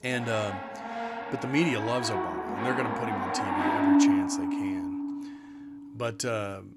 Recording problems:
background music; very loud; throughout; 3 dB above the speech

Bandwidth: 15.5 kHz